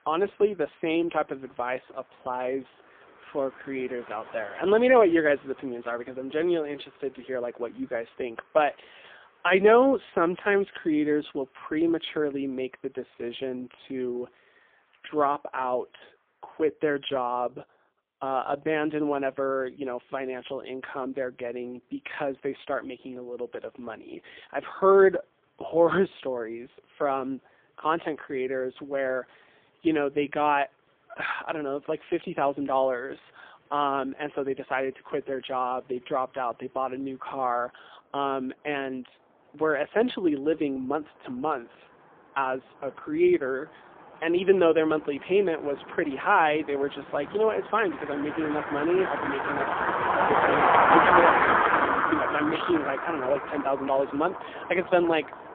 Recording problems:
phone-call audio; poor line; nothing above 3.5 kHz
traffic noise; very loud; throughout; 2 dB above the speech

